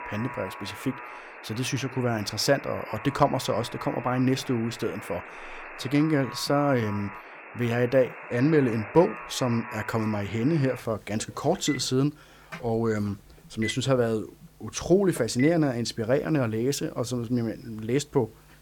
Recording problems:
alarms or sirens; noticeable; throughout; 15 dB below the speech

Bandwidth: 18.5 kHz